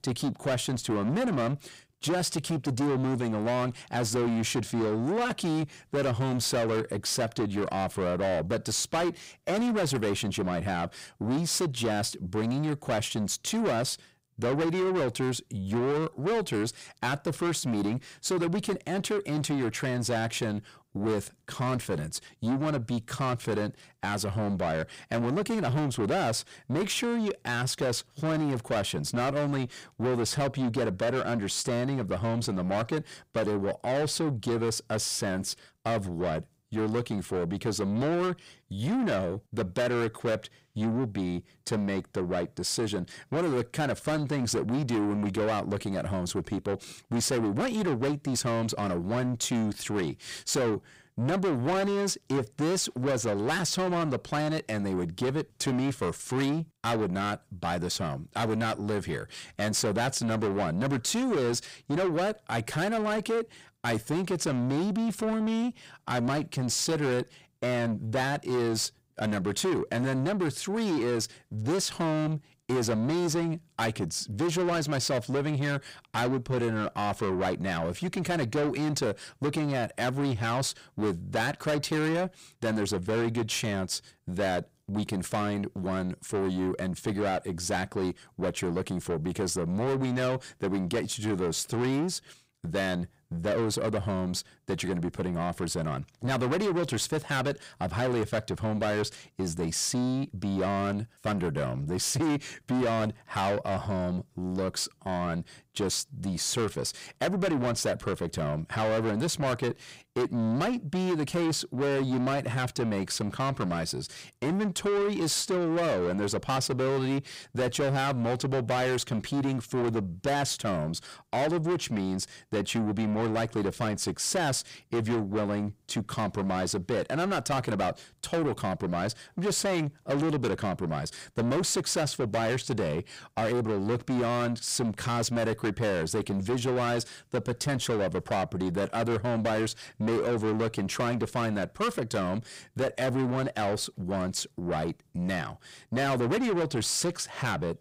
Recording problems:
distortion; heavy; 7 dB below the speech

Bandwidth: 15.5 kHz